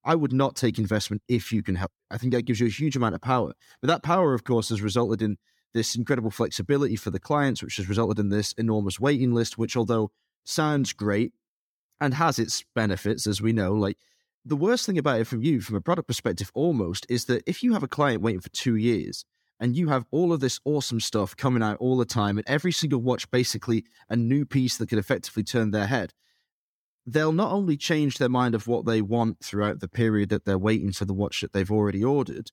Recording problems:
none

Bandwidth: 18 kHz